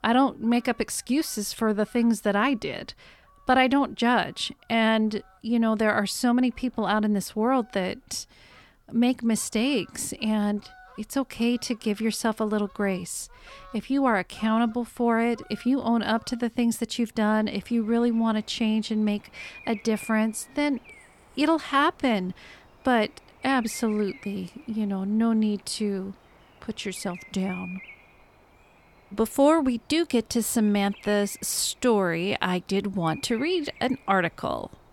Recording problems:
animal sounds; faint; throughout; 25 dB below the speech

